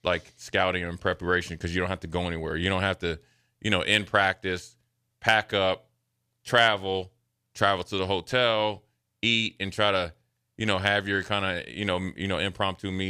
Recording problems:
abrupt cut into speech; at the end

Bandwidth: 14.5 kHz